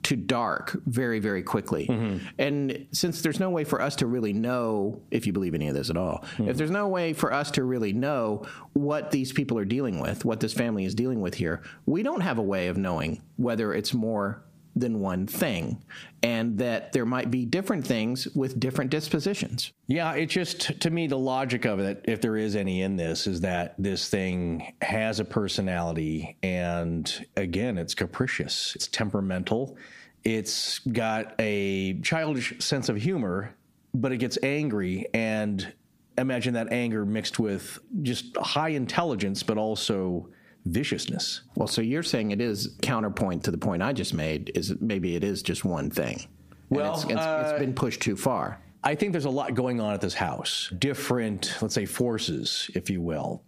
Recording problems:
squashed, flat; heavily

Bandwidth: 15 kHz